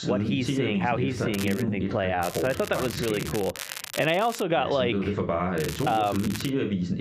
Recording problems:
squashed, flat; heavily
muffled; very slightly; fading above 3.5 kHz
voice in the background; loud; throughout; 2 dB below the speech
crackling; noticeable; at 1.5 s, from 2 to 4.5 s and at 5.5 s; 10 dB below the speech
uneven, jittery; strongly; from 0.5 to 6.5 s

